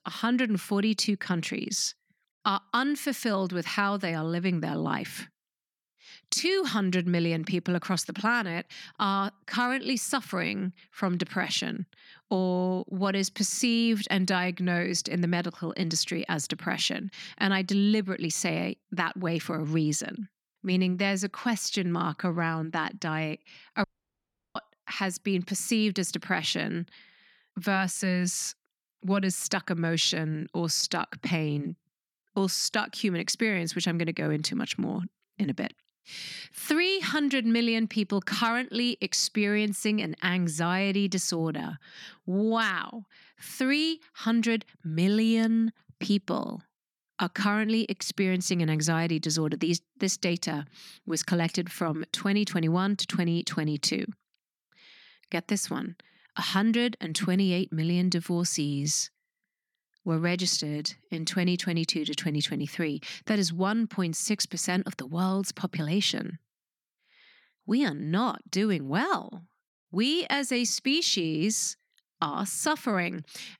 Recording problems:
audio cutting out; at 24 s for 0.5 s

